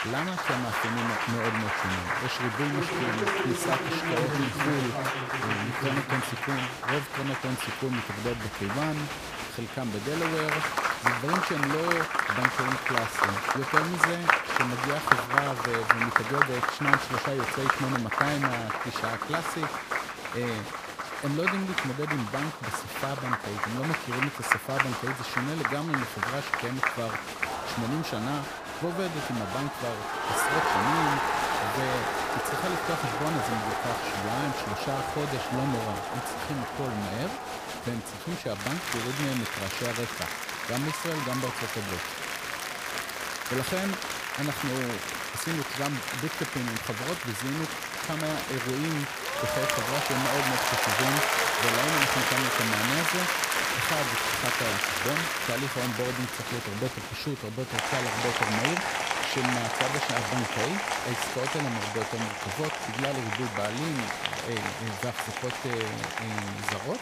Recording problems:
crowd noise; very loud; throughout; 5 dB above the speech

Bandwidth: 15 kHz